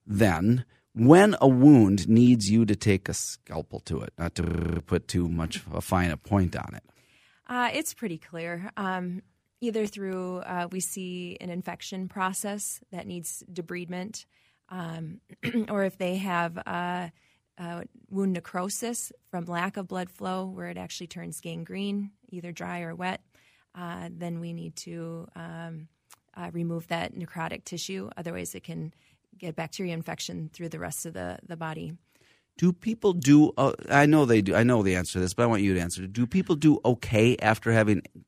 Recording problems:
audio freezing; at 4.5 s

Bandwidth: 15 kHz